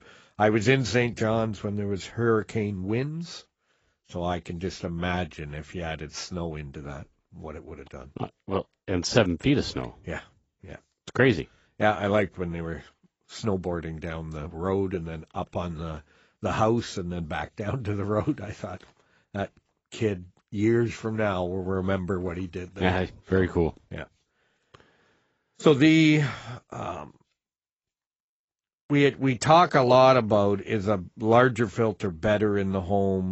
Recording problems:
garbled, watery; badly; nothing above 8 kHz
abrupt cut into speech; at the end

